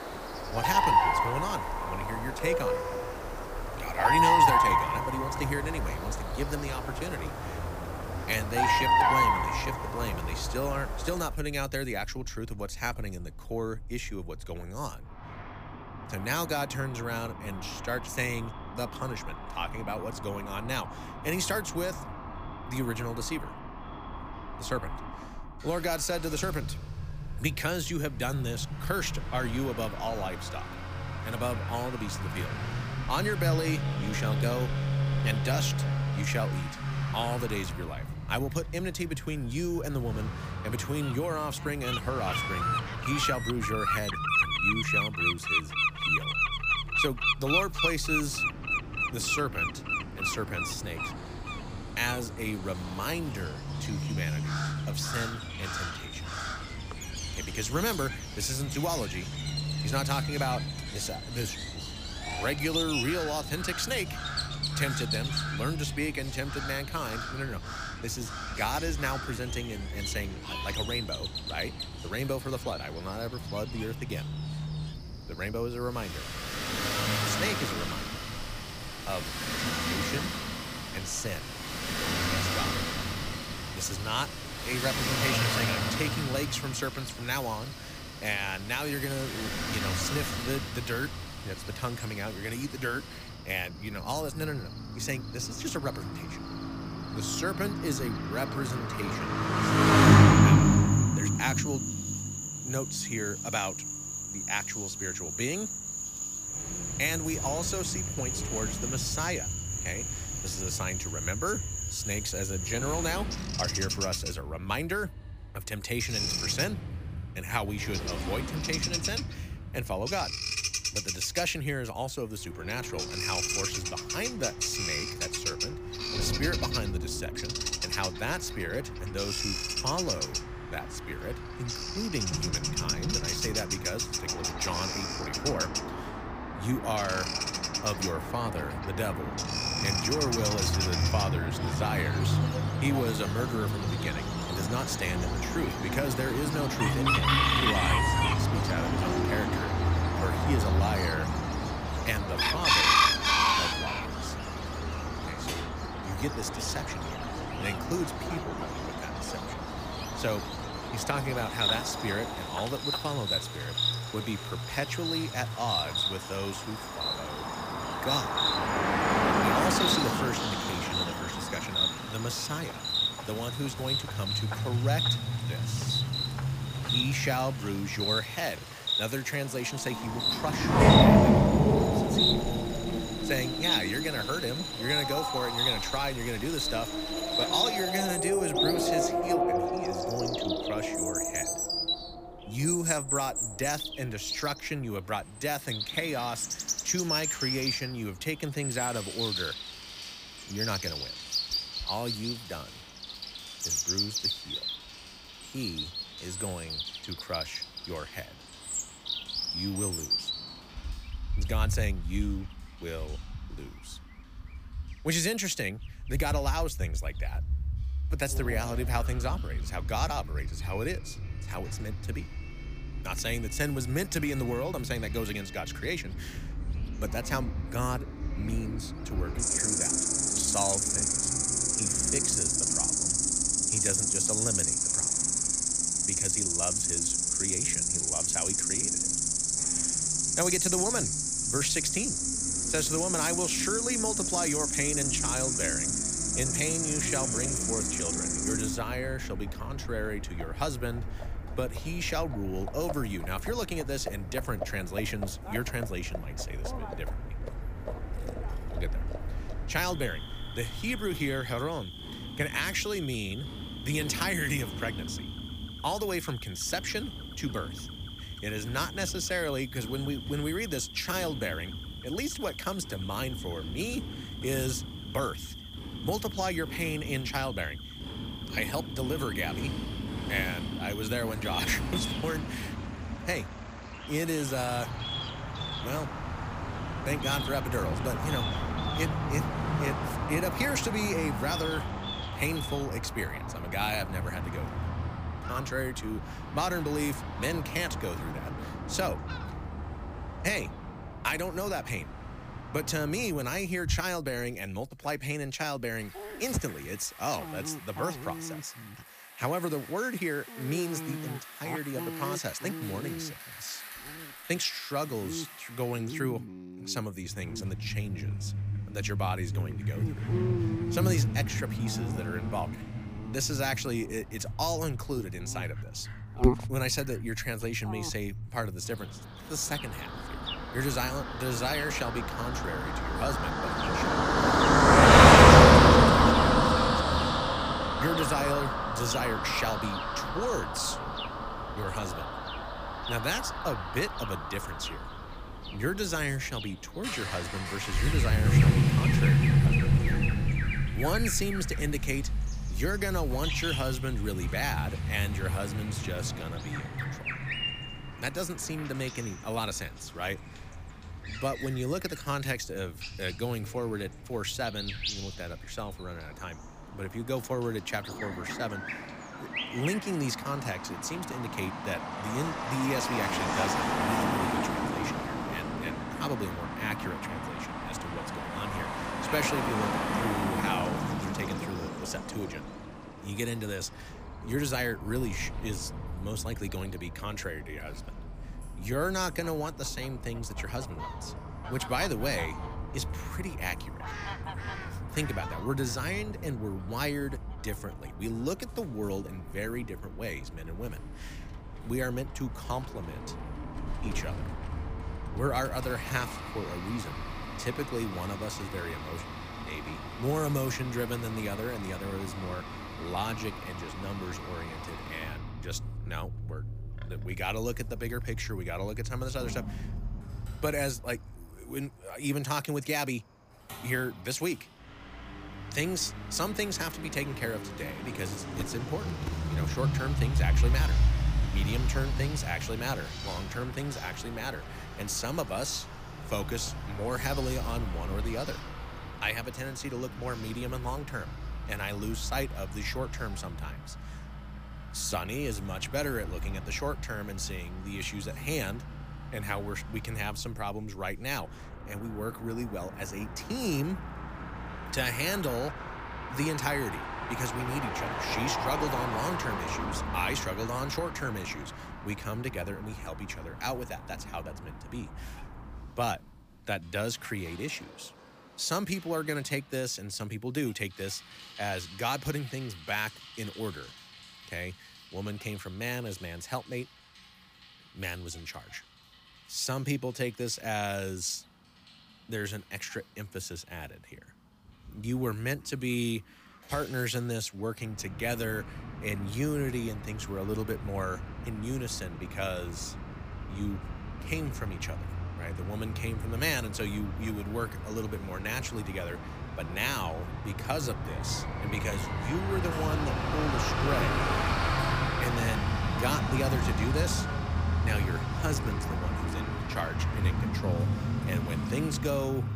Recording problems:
animal sounds; very loud; throughout; 2 dB above the speech
traffic noise; very loud; throughout; 2 dB above the speech

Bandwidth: 15 kHz